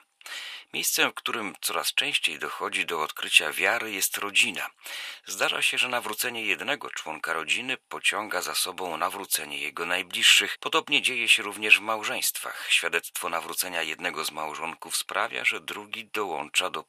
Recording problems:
thin; very; fading below 850 Hz

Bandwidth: 14.5 kHz